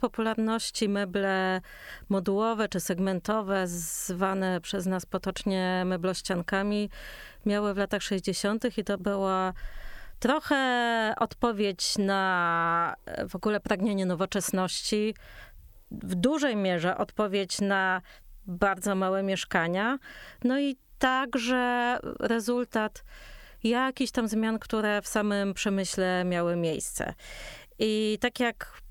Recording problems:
squashed, flat; heavily

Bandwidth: 18.5 kHz